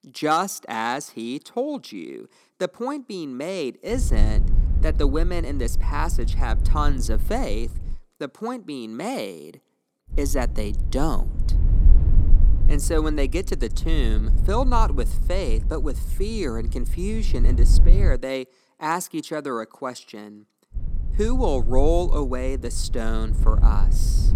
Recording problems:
low rumble; noticeable; from 4 to 8 s, from 10 to 18 s and from 21 s on; 15 dB below the speech

